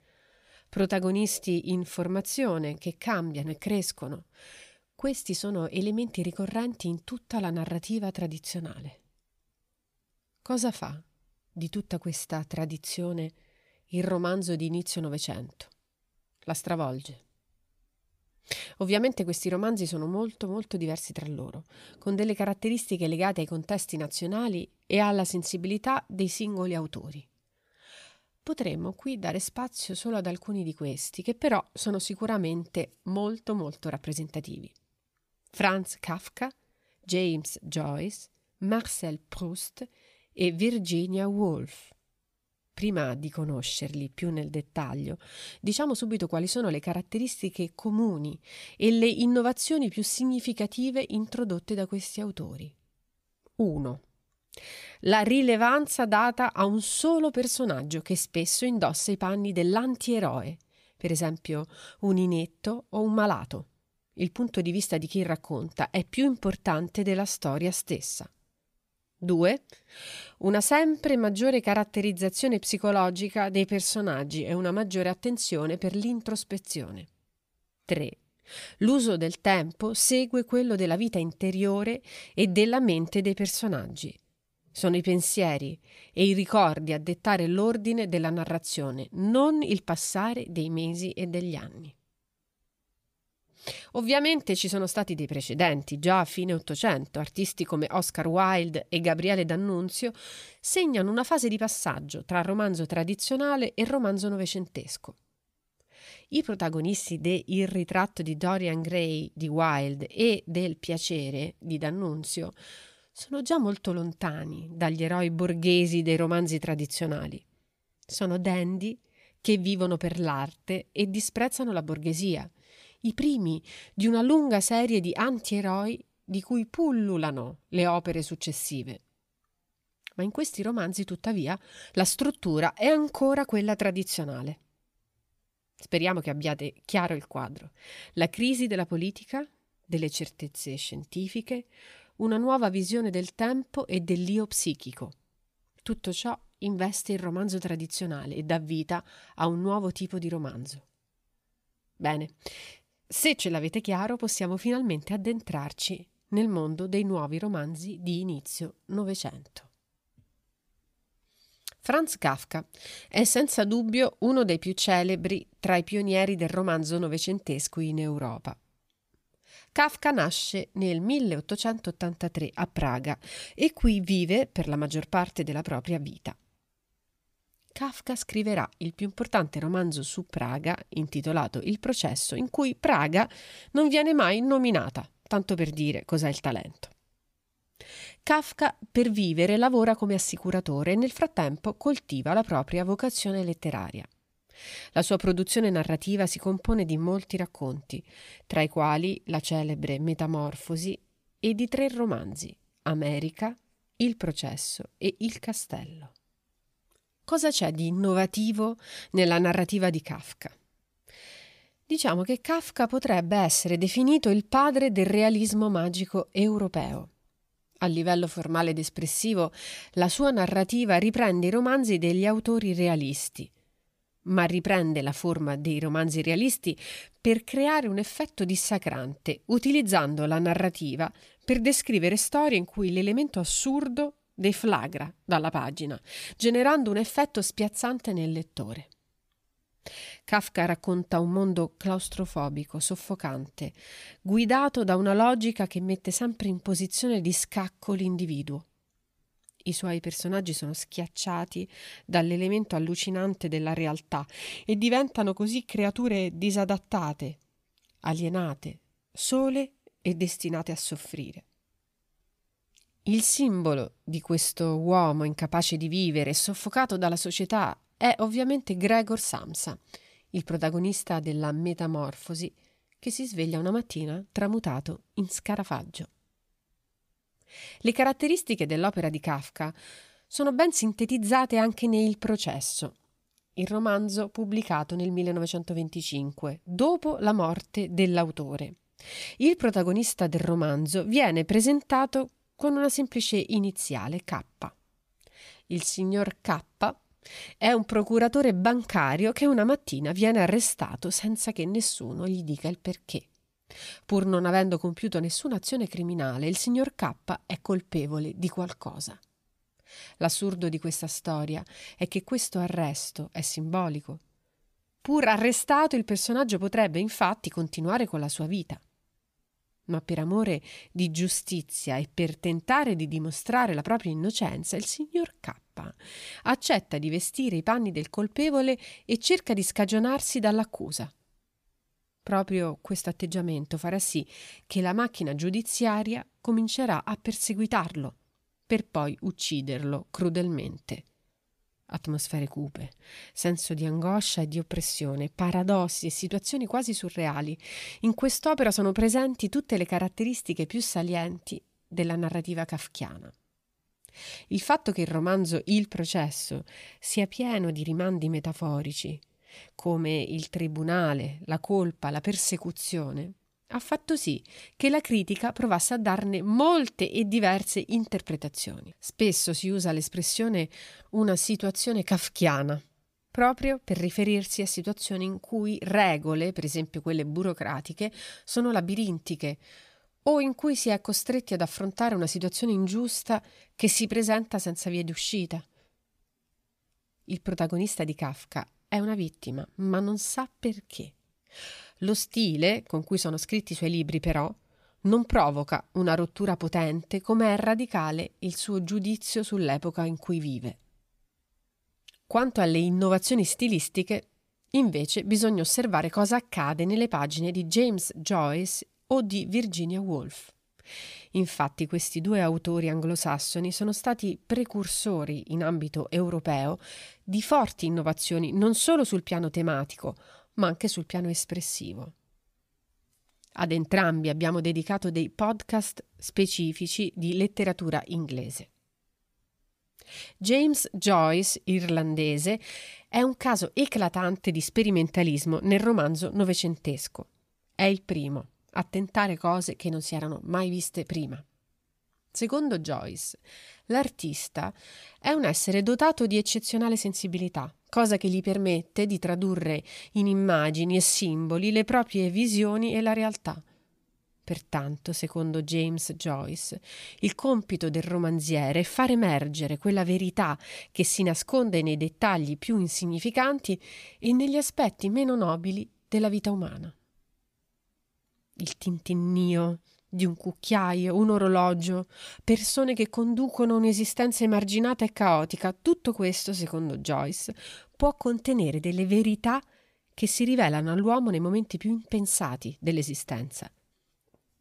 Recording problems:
none

